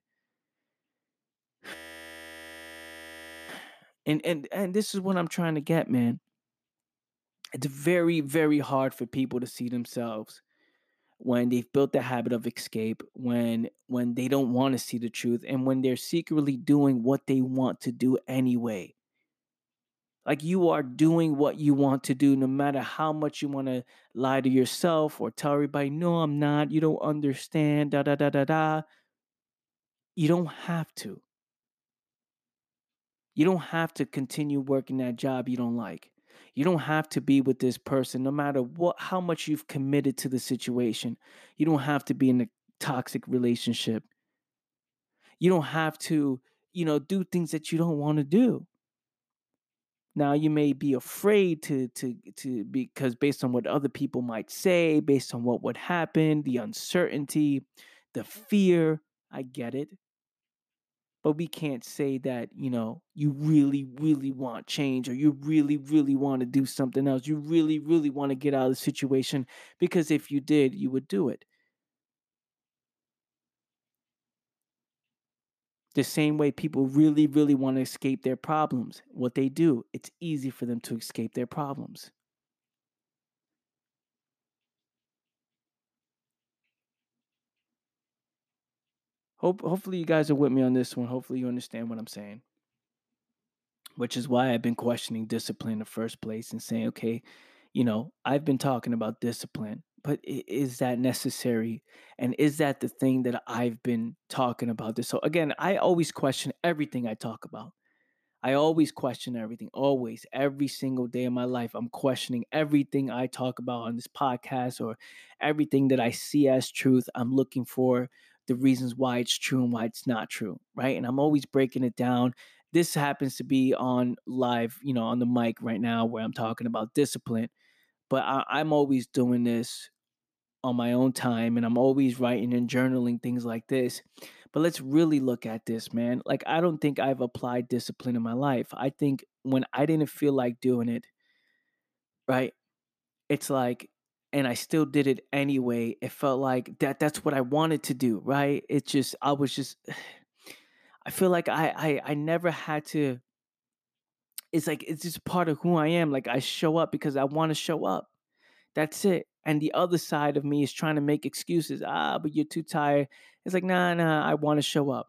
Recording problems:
audio freezing; at 1.5 s for 2 s

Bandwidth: 14.5 kHz